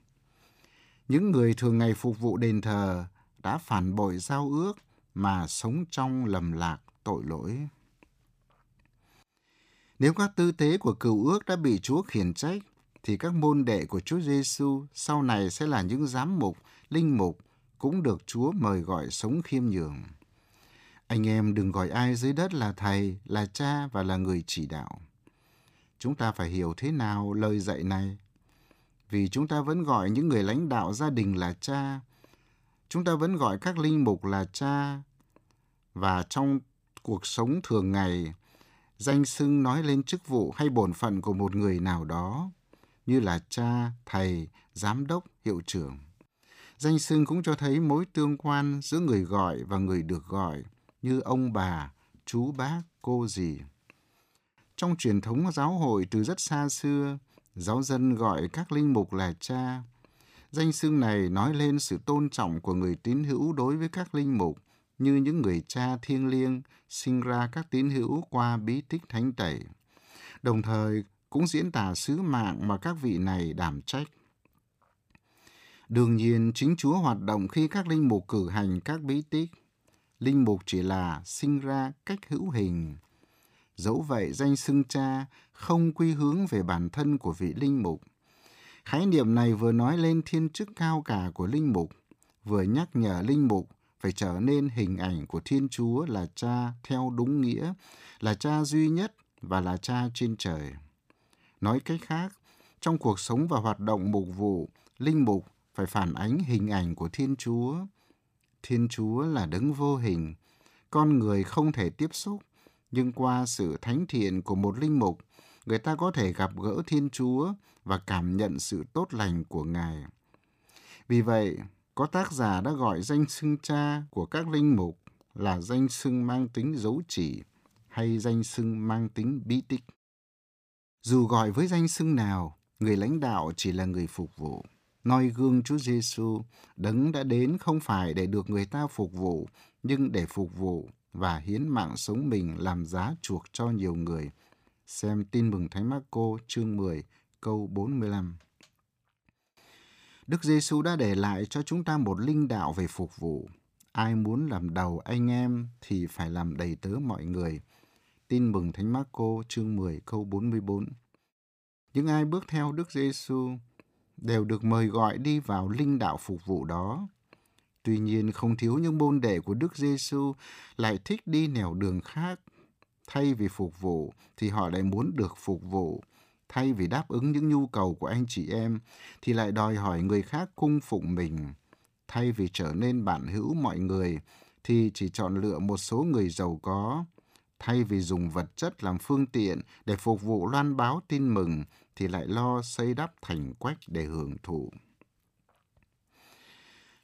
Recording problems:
none

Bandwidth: 15 kHz